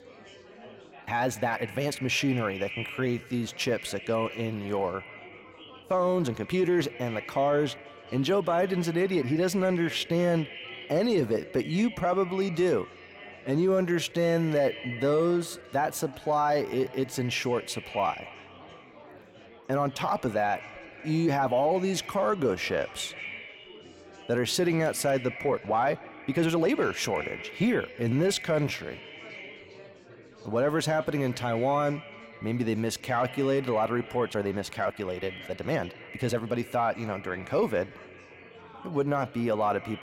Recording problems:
echo of what is said; noticeable; throughout; 180 ms later, 15 dB below the speech
chatter from many people; faint; throughout; 20 dB below the speech
uneven, jittery; strongly; from 1 to 37 s

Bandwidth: 16 kHz